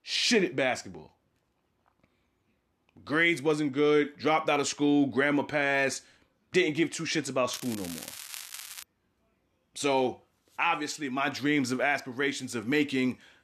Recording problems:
crackling; noticeable; from 7.5 to 9 s; 15 dB below the speech

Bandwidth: 13.5 kHz